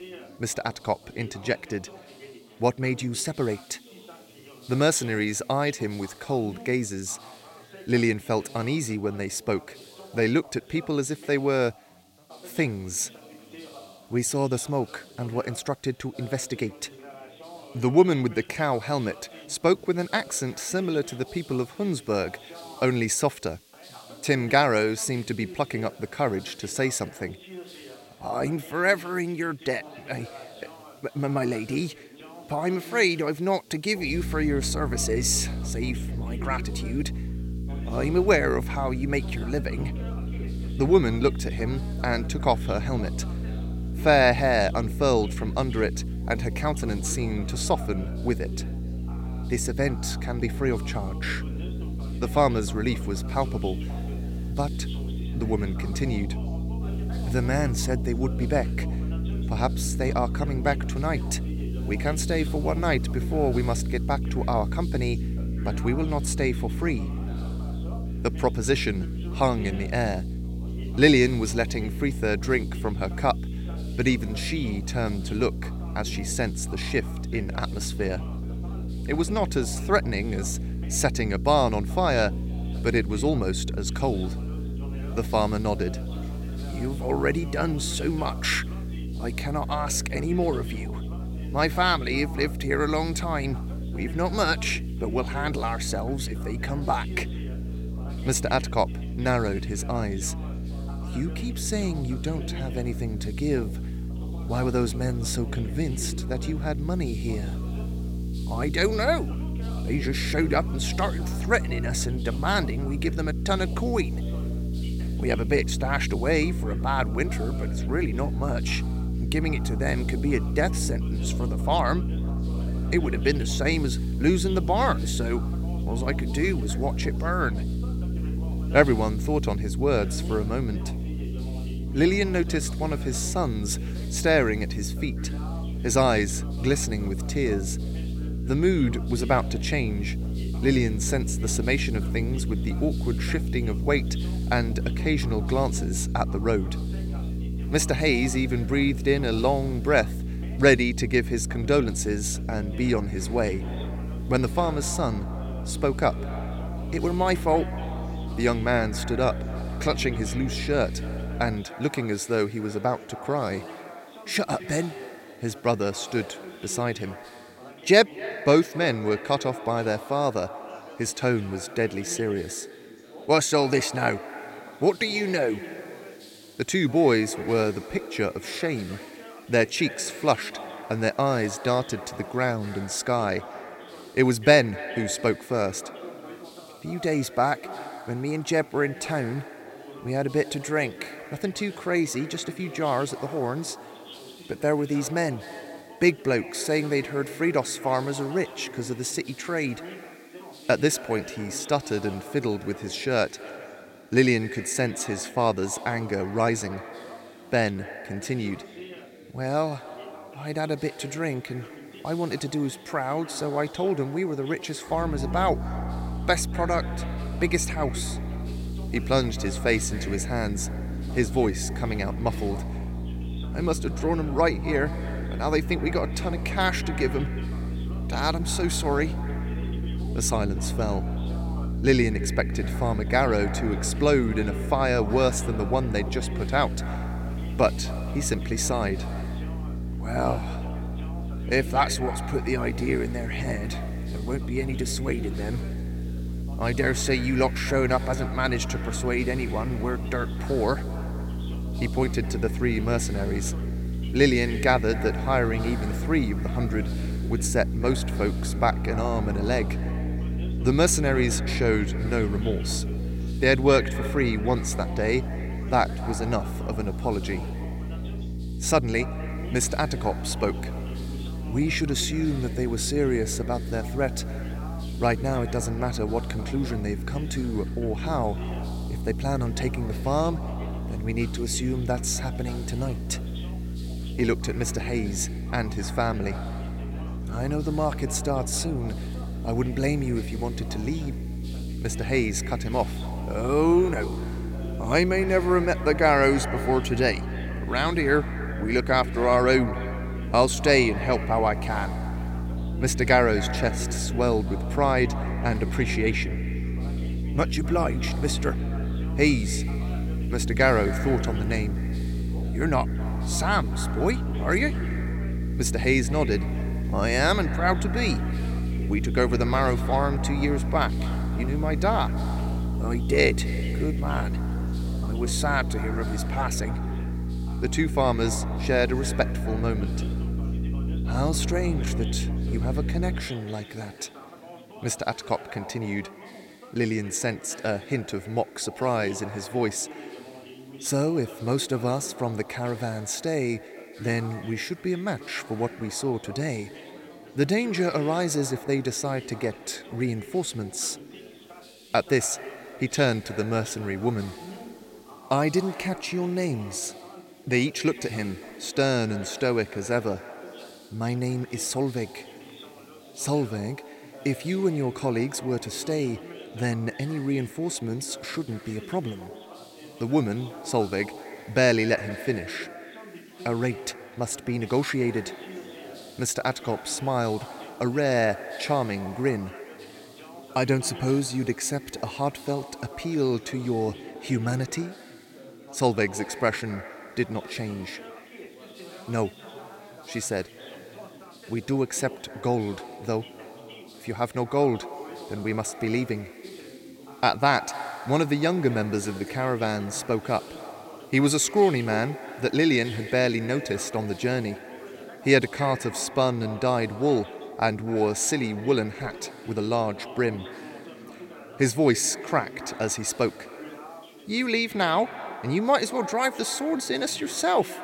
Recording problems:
echo of what is said; noticeable; from 2:33 on; 250 ms later, 15 dB below the speech
electrical hum; noticeable; from 34 s to 2:42 and from 3:35 to 5:33; 60 Hz, 15 dB below the speech
background chatter; noticeable; throughout; 3 voices, 20 dB below the speech
hiss; faint; throughout; 25 dB below the speech

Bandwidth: 16.5 kHz